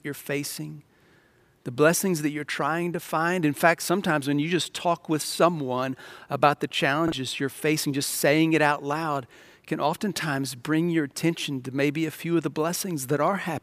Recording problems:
choppy; occasionally; at 7 s; 2% of the speech affected

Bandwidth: 15 kHz